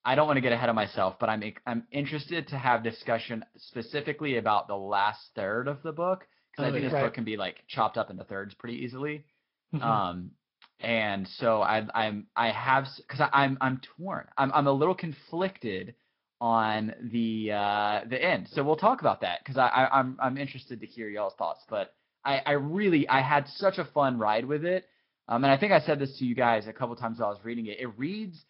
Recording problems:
high frequencies cut off; noticeable; nothing above 5.5 kHz
garbled, watery; slightly

